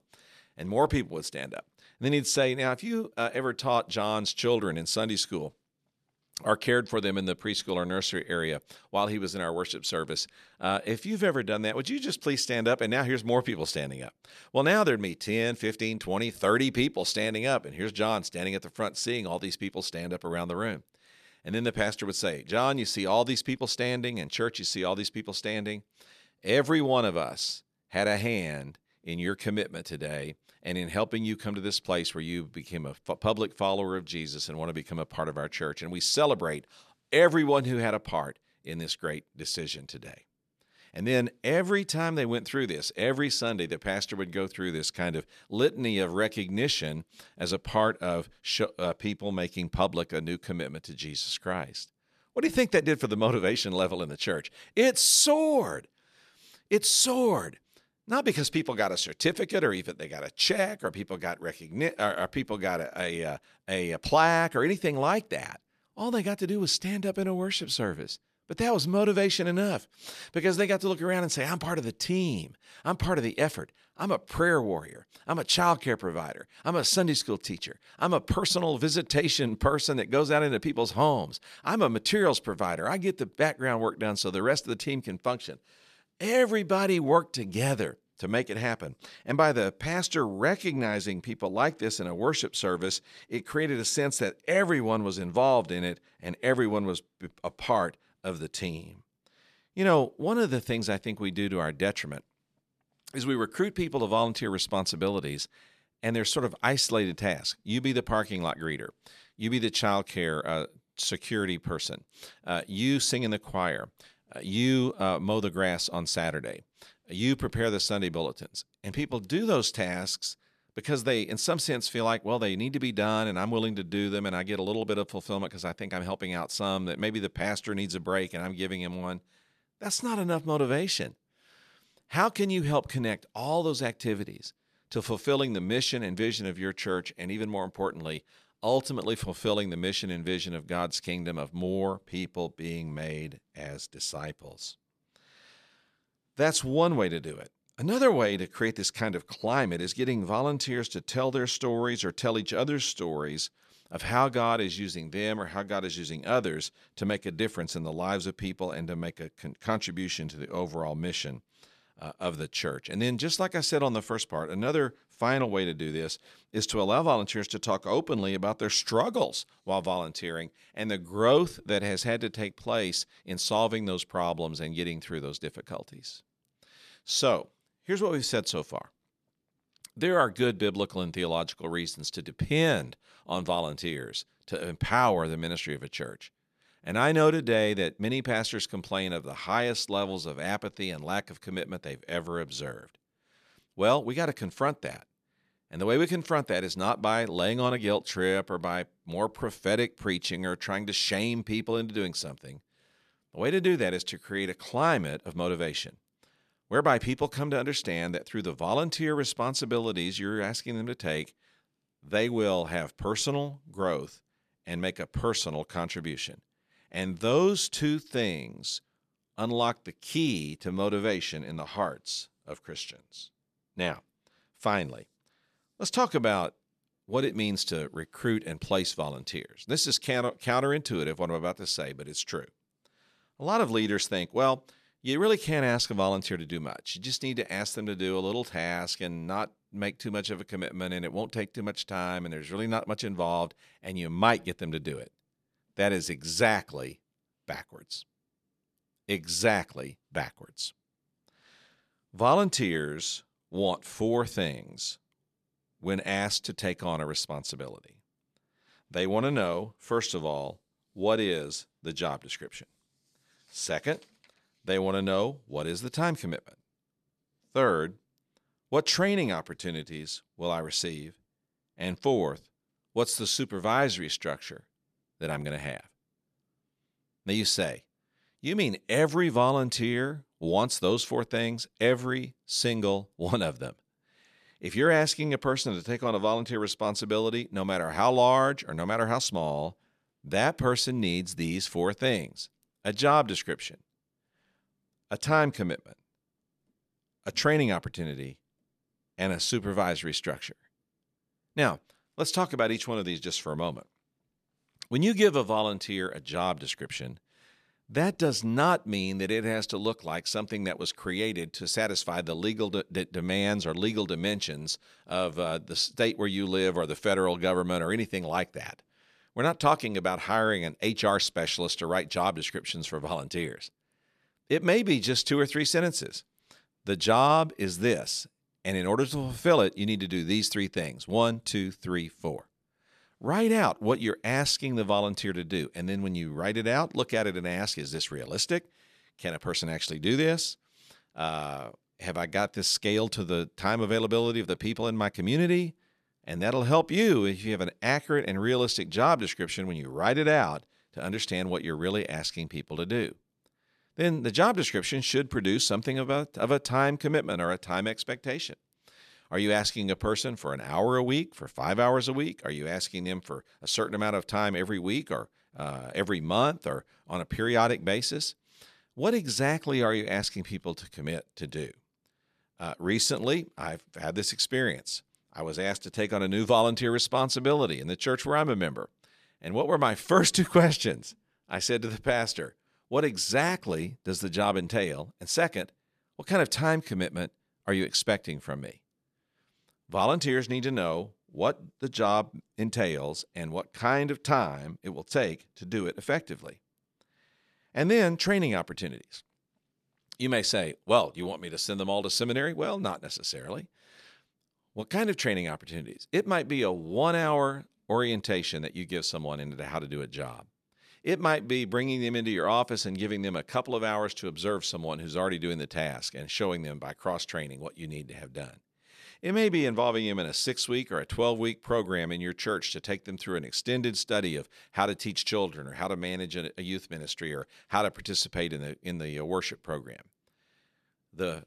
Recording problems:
none

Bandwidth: 14.5 kHz